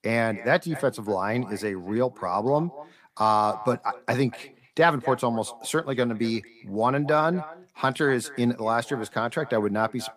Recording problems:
echo of what is said; noticeable; throughout; 240 ms later, 20 dB below the speech

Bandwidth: 15 kHz